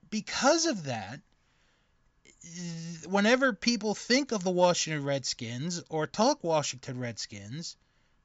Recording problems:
high frequencies cut off; noticeable; nothing above 8 kHz

